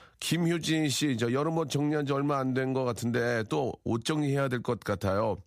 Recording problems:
none

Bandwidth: 15 kHz